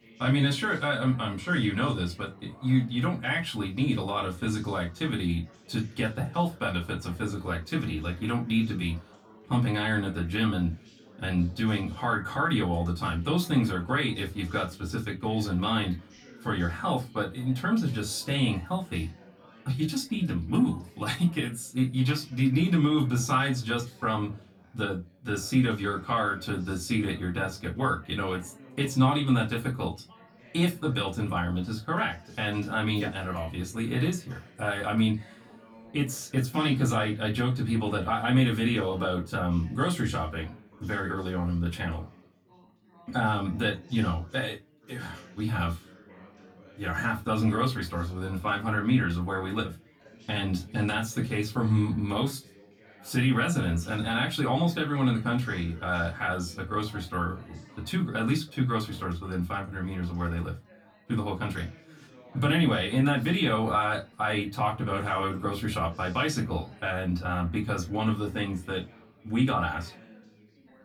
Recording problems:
off-mic speech; far
room echo; very slight; dies away in 0.2 s
background chatter; faint; throughout; 4 voices, 25 dB below the speech

